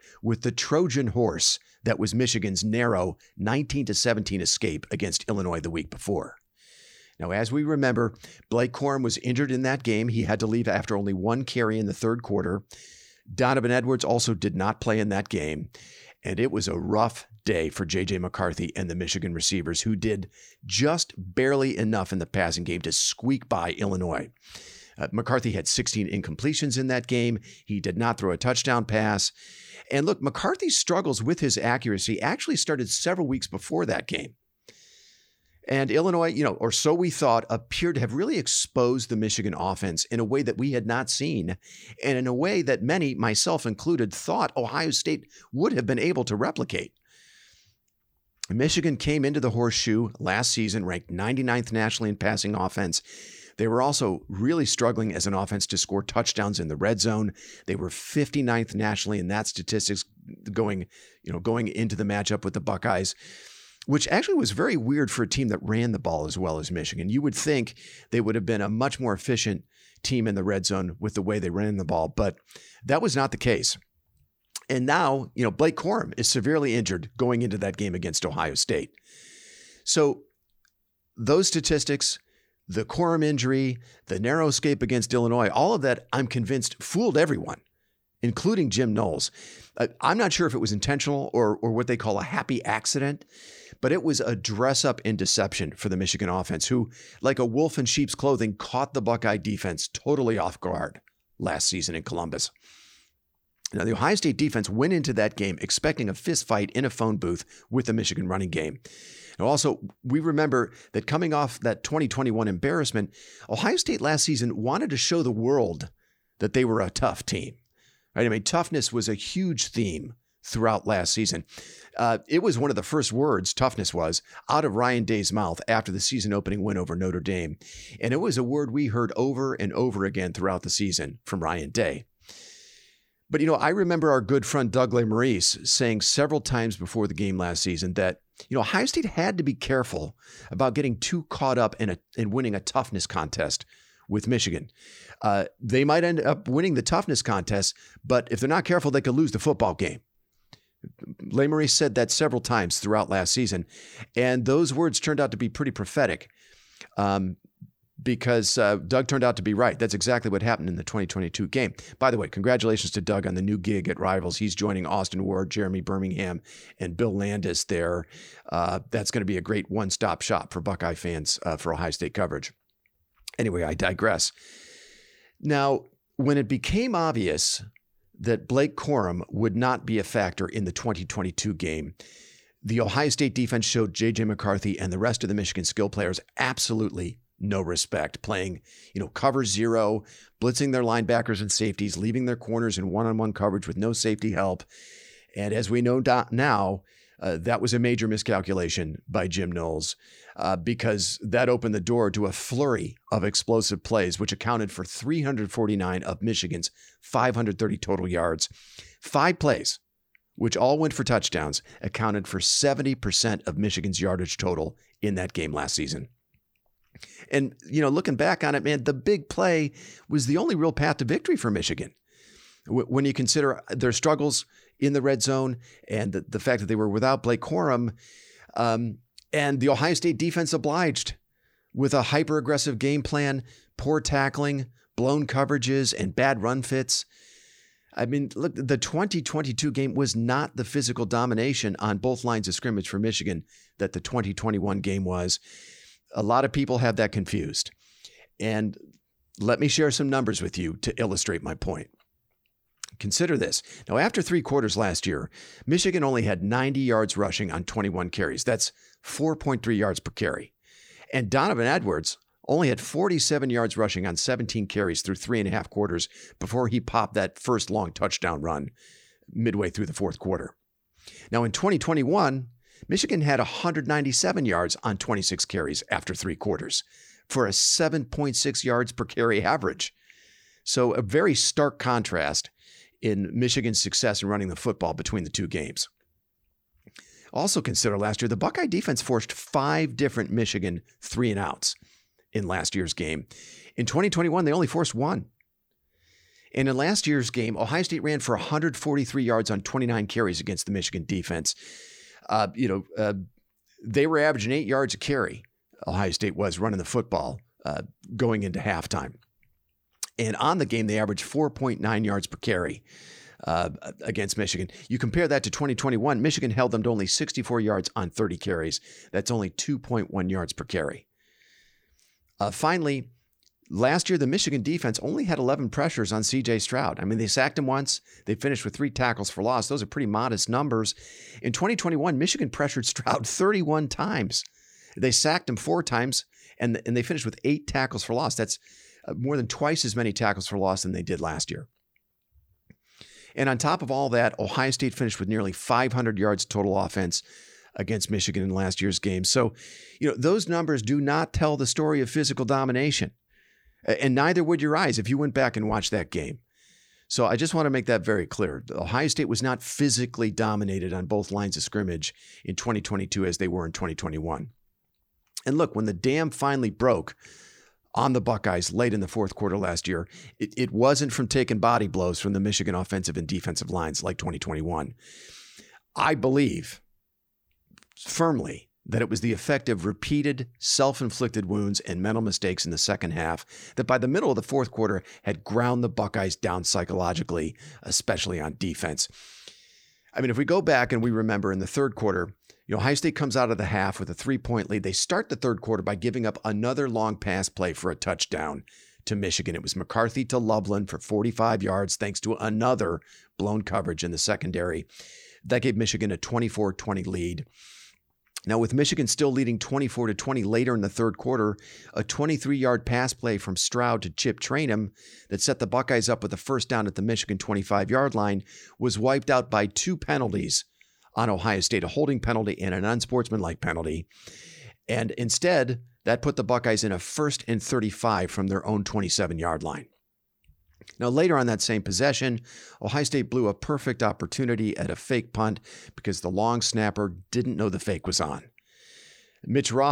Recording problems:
abrupt cut into speech; at the end

